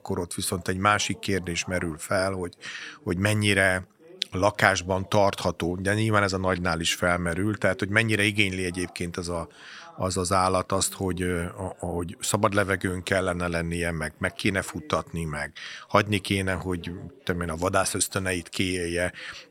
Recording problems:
background chatter; faint; throughout; 3 voices, 25 dB below the speech

